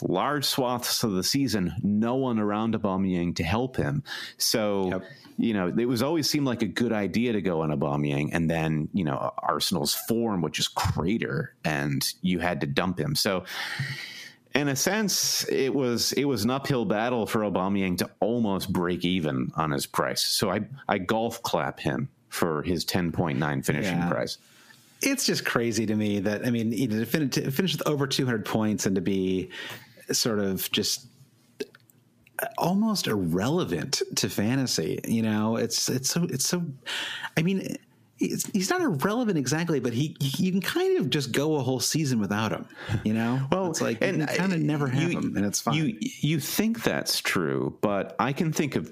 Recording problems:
squashed, flat; heavily

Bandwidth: 15 kHz